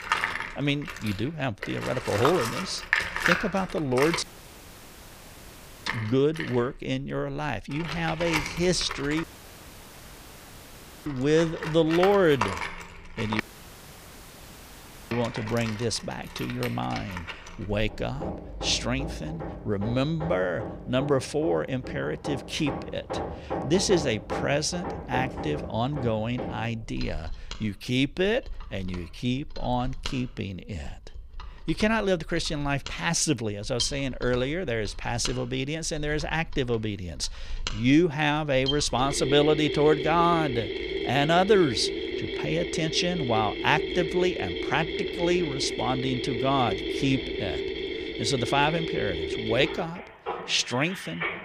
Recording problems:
machinery noise; loud; throughout; 6 dB below the speech
audio cutting out; at 4 s for 1.5 s, at 9 s for 2 s and at 13 s for 1.5 s

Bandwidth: 15 kHz